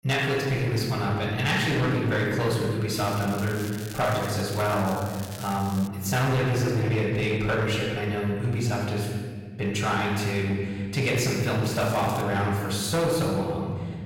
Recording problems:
off-mic speech; far
room echo; noticeable; dies away in 2.2 s
distortion; slight; 12% of the sound clipped
crackling; noticeable; from 3 to 4.5 s, from 4.5 to 6 s and at 12 s; 15 dB below the speech

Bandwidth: 16.5 kHz